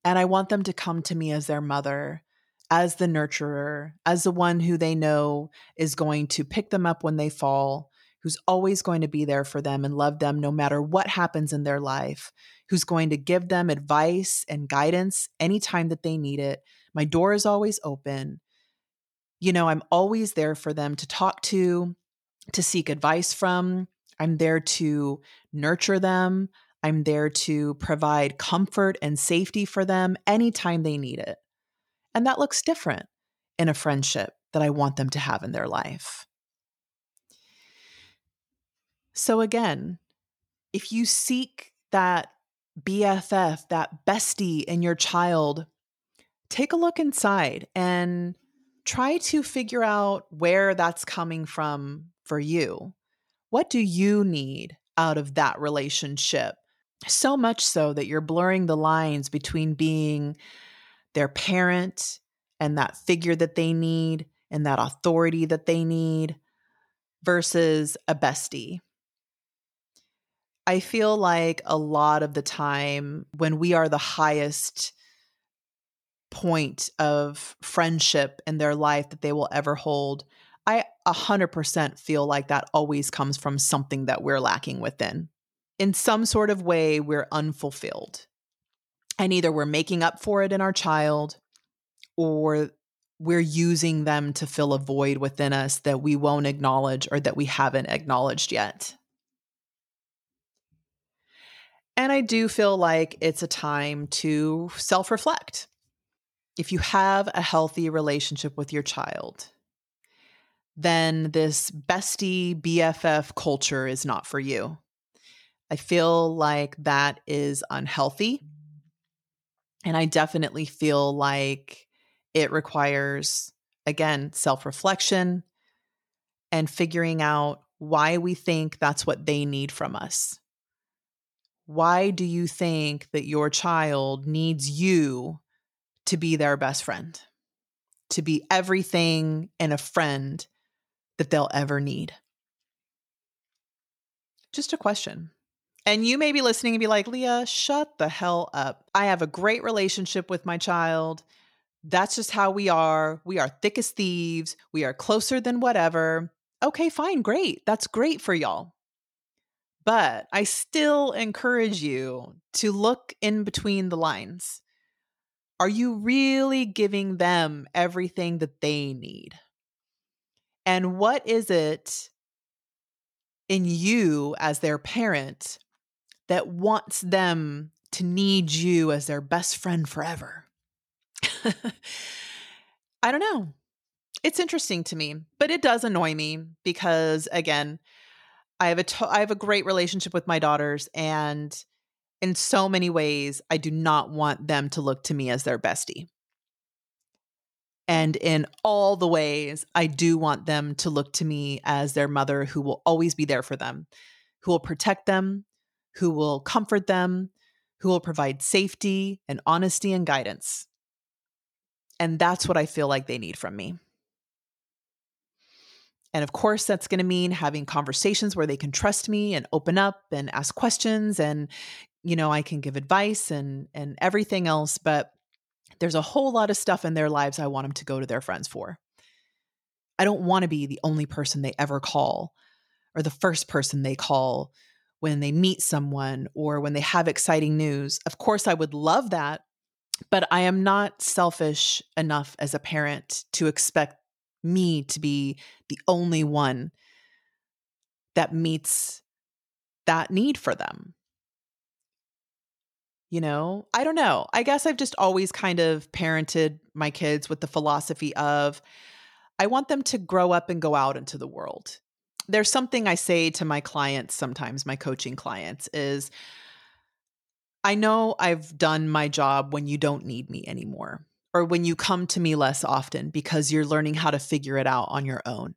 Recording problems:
none

